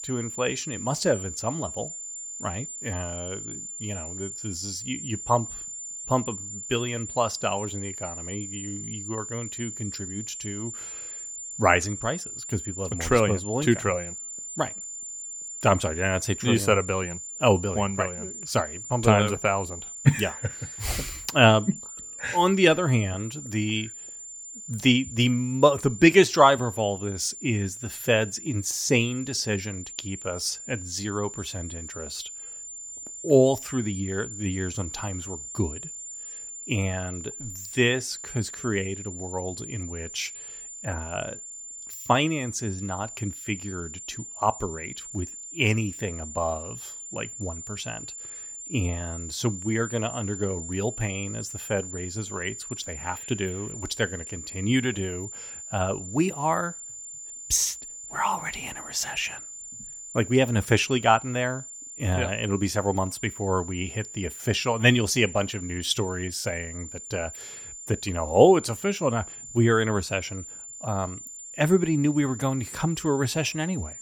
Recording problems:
high-pitched whine; noticeable; throughout; 7 kHz, 10 dB below the speech

